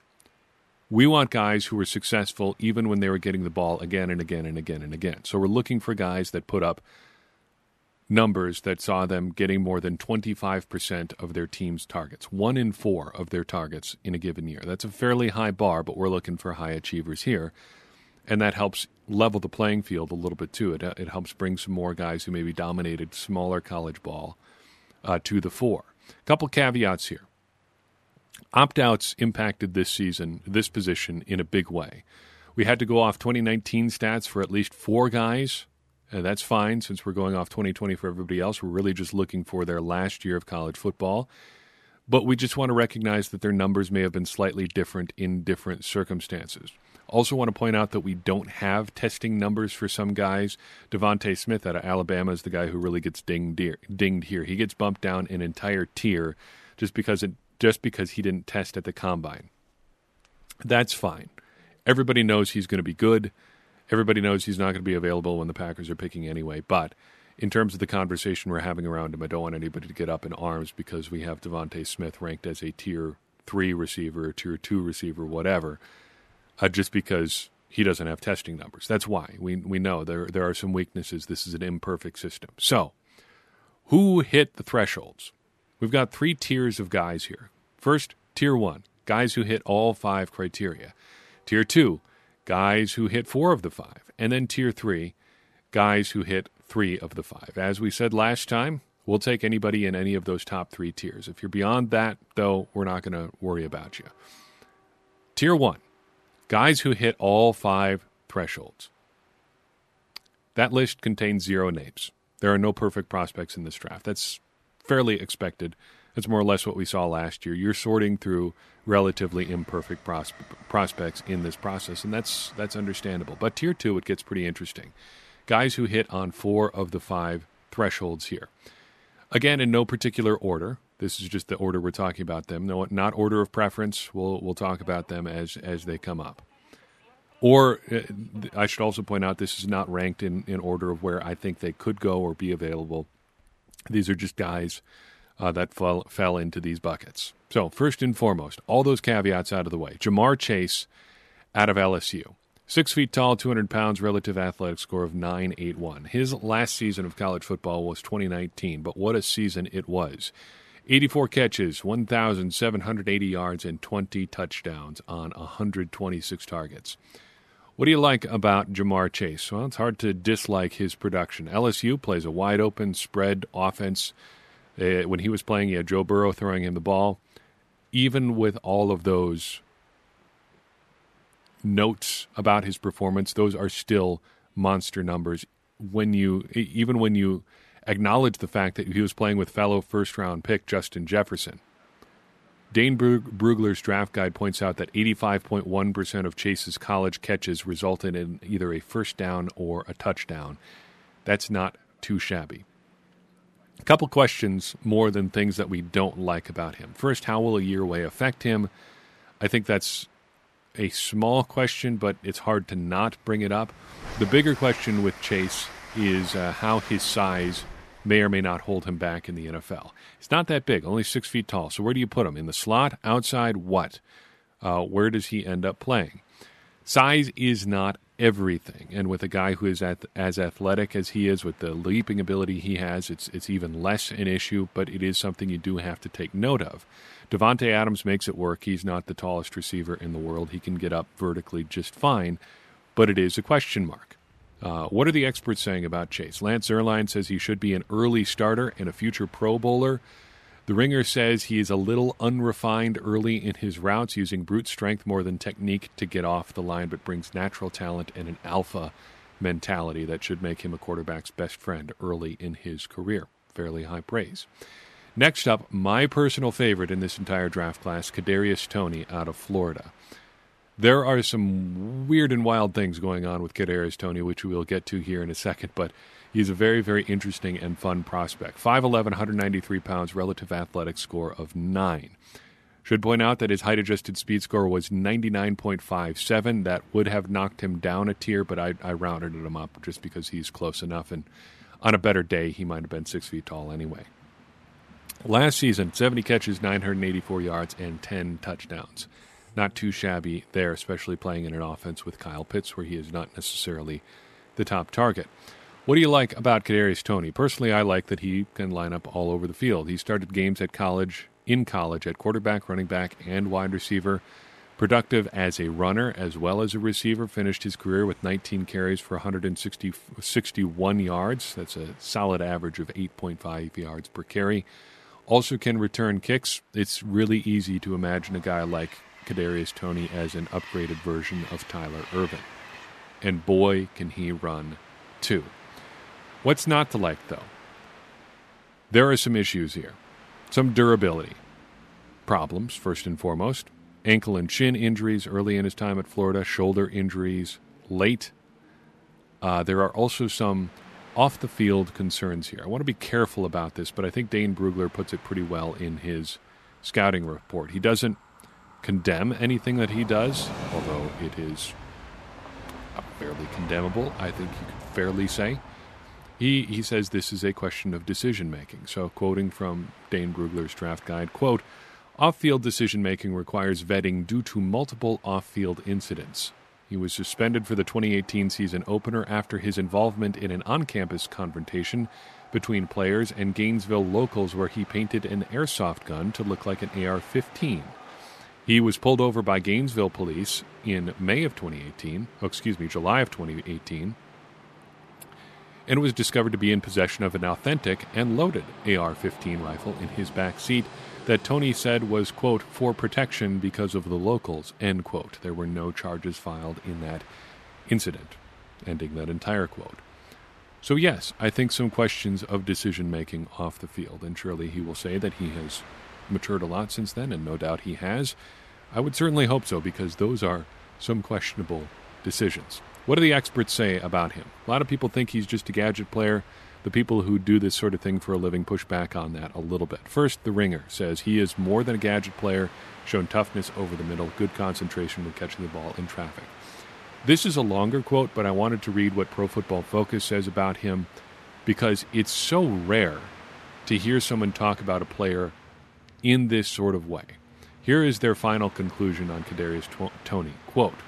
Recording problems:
train or aircraft noise; faint; throughout; 20 dB below the speech

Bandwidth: 13.5 kHz